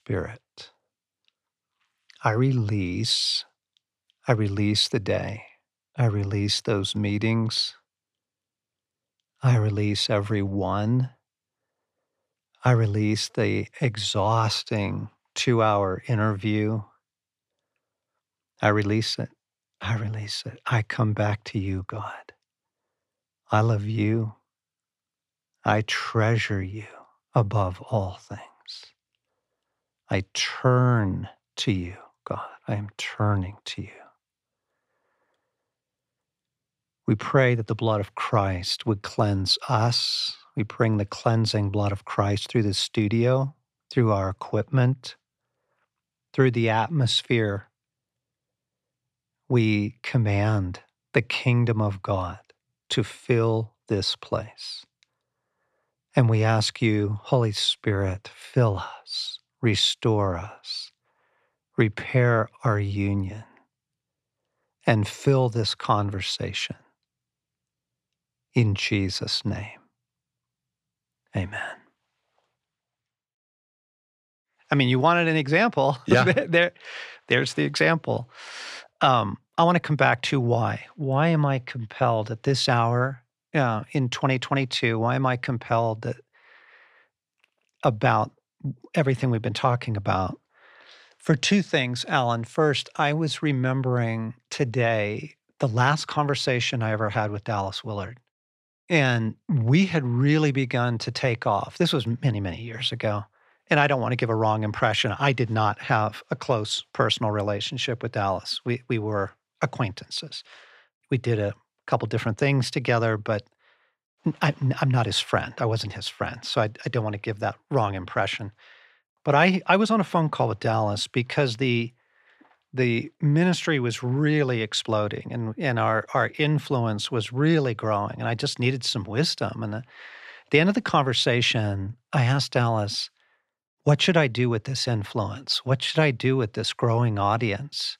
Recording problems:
none

